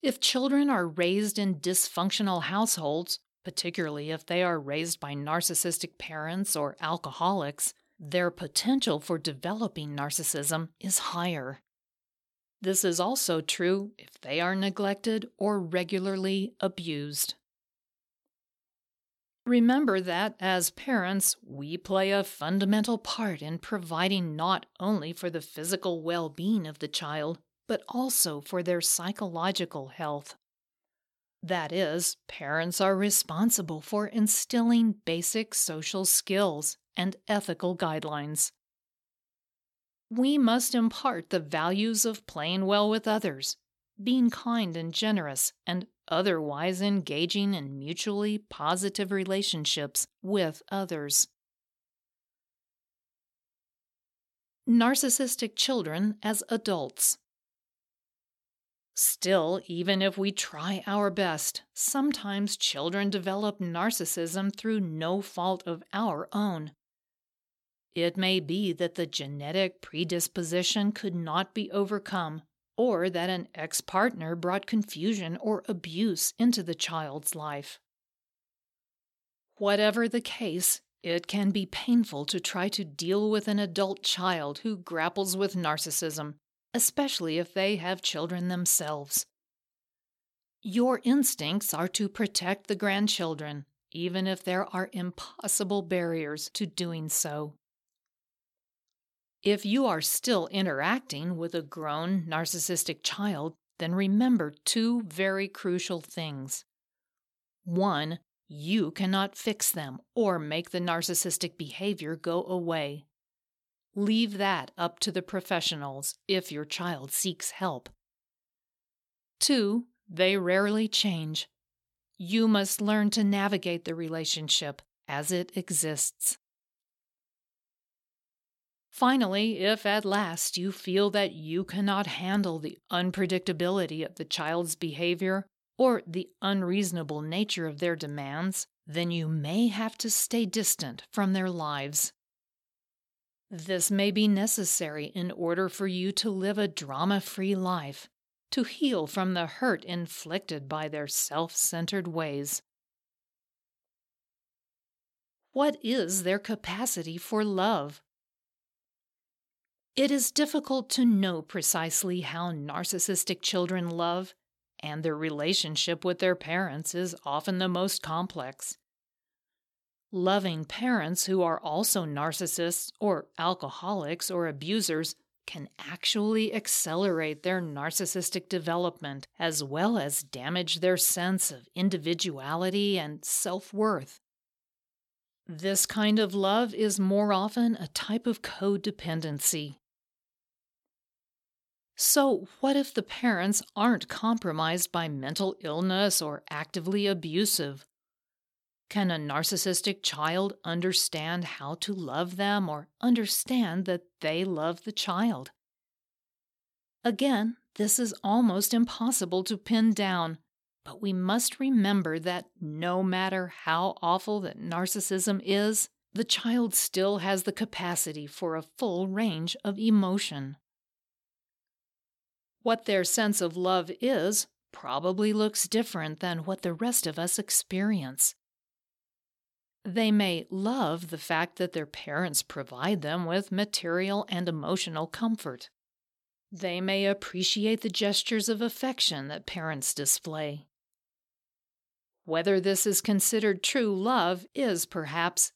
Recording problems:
none

